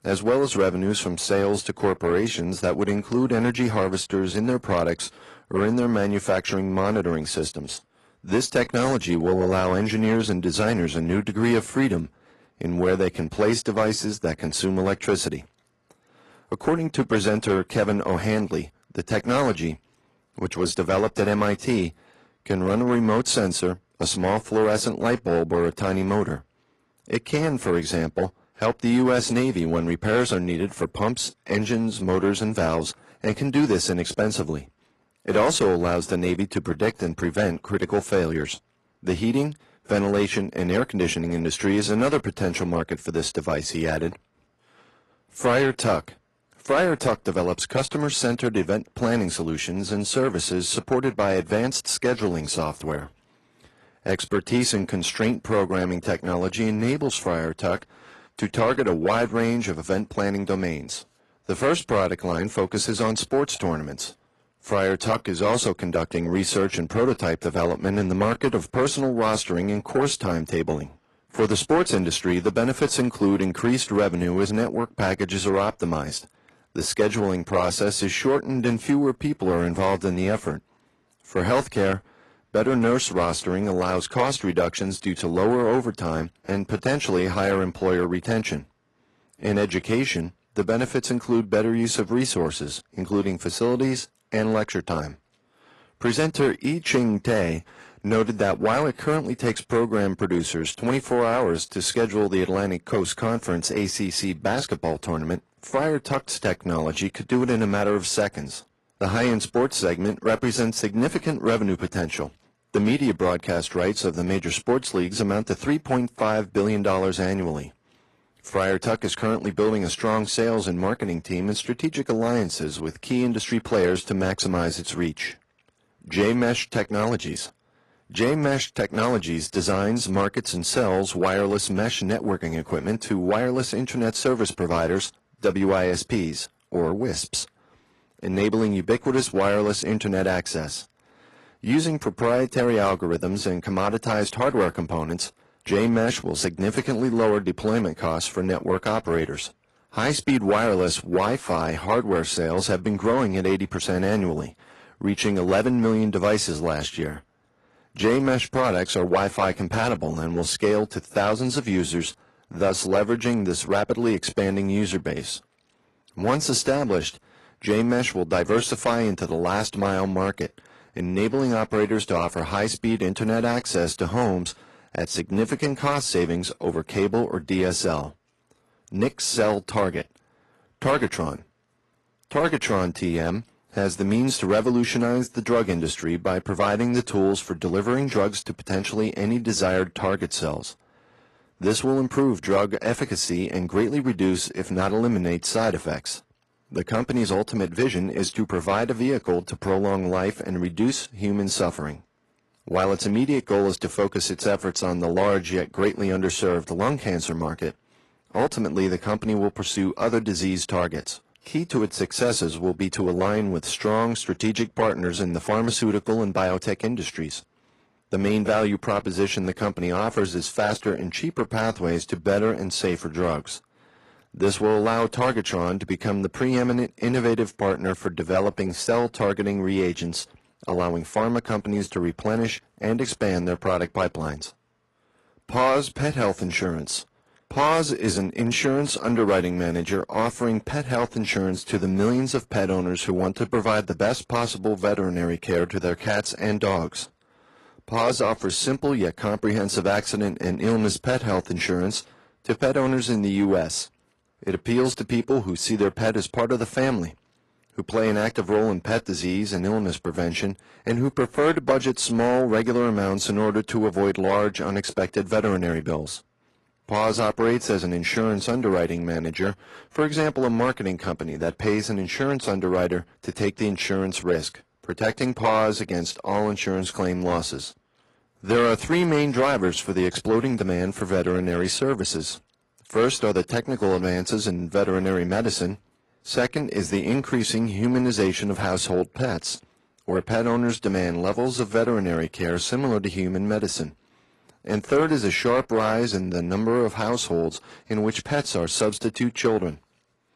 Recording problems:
distortion; slight; 10 dB below the speech
garbled, watery; slightly

